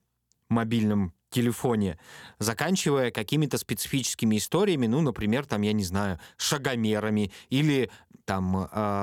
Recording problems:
abrupt cut into speech; at the end

